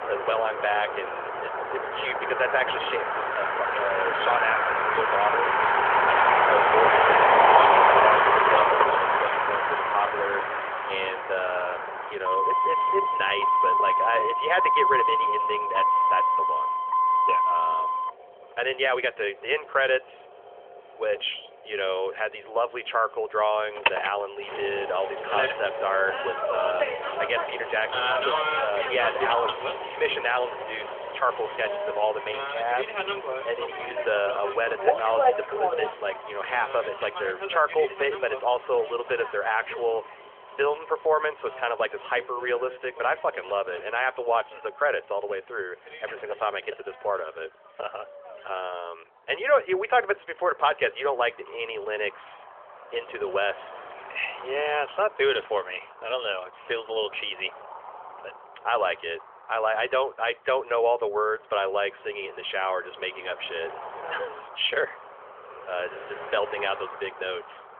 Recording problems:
phone-call audio; nothing above 3.5 kHz
traffic noise; very loud; throughout; 4 dB above the speech

